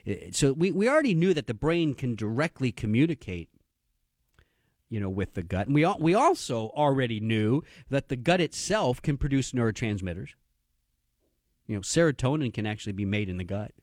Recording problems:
none

